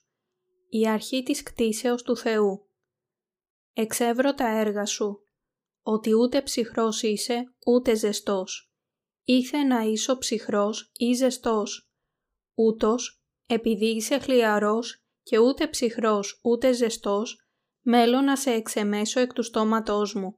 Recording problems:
none

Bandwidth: 15 kHz